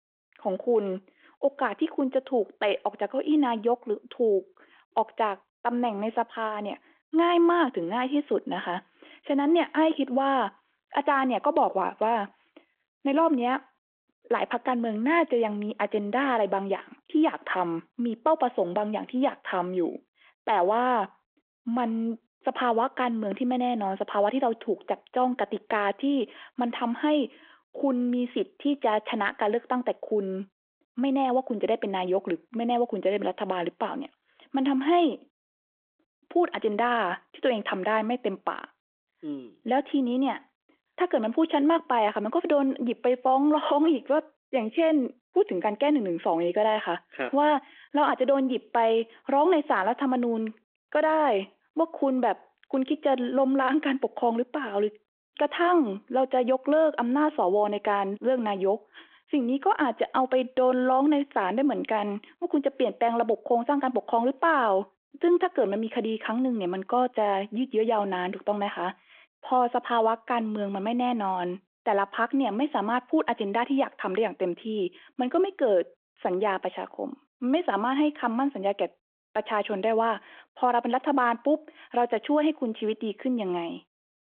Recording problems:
phone-call audio

